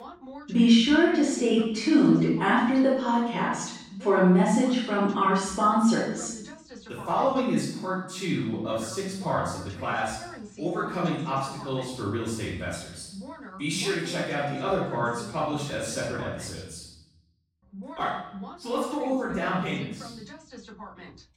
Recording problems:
room echo; strong; dies away in 0.8 s
off-mic speech; far
voice in the background; noticeable; throughout; 20 dB below the speech

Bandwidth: 16 kHz